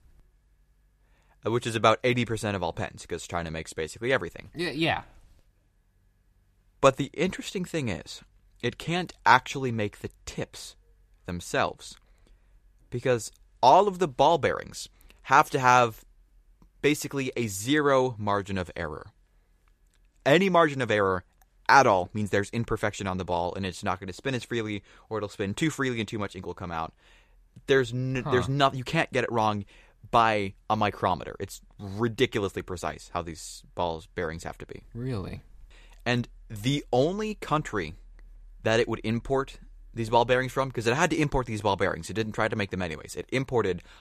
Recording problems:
none

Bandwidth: 14.5 kHz